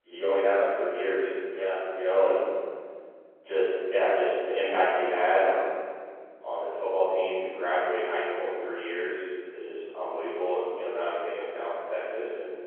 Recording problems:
room echo; strong; dies away in 1.9 s
off-mic speech; far
phone-call audio

